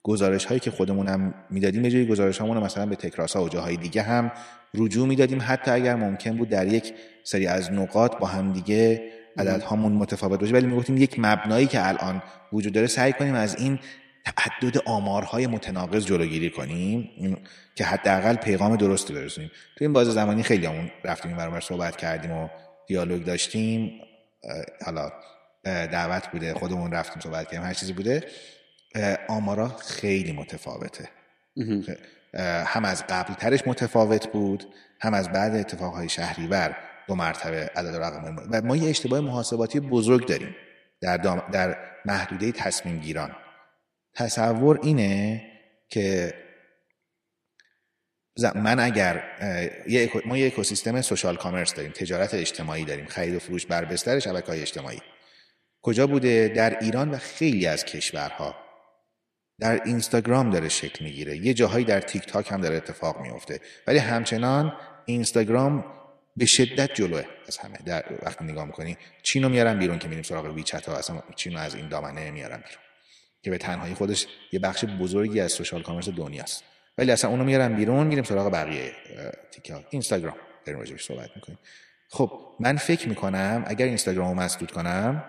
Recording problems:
echo of what is said; noticeable; throughout; 110 ms later, 15 dB below the speech

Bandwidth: 13.5 kHz